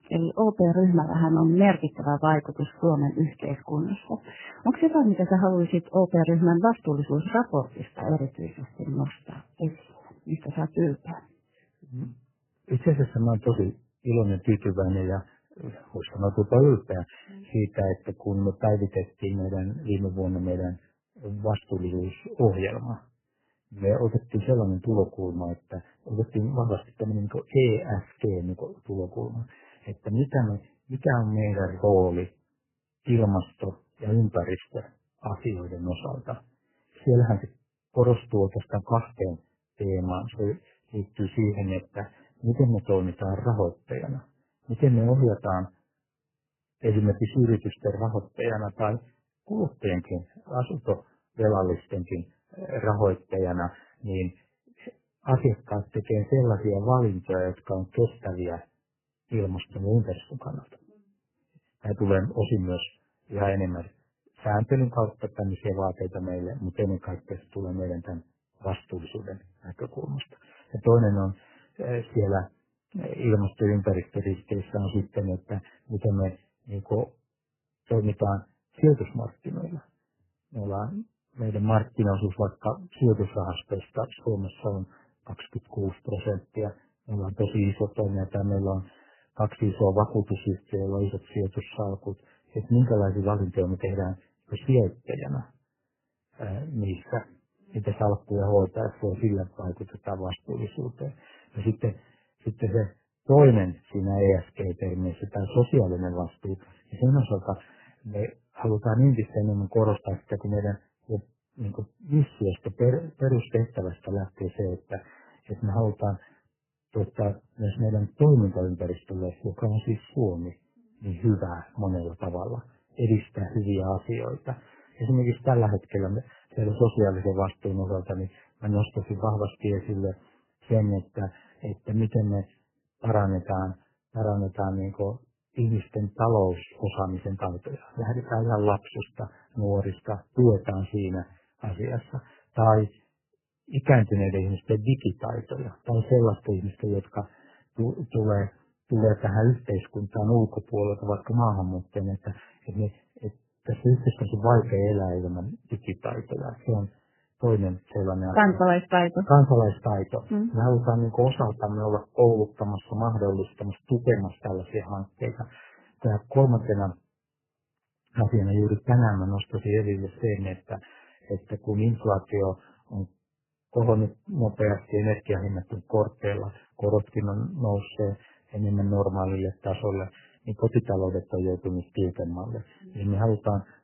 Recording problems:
garbled, watery; badly; nothing above 3 kHz

